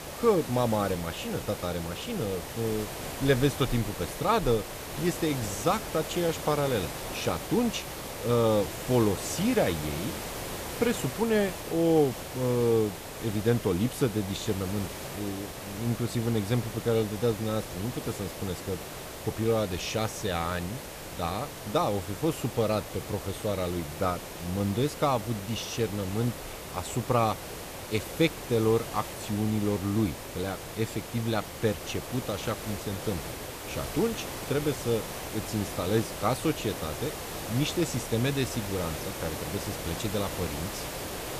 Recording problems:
hiss; loud; throughout; 7 dB below the speech

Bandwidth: 14.5 kHz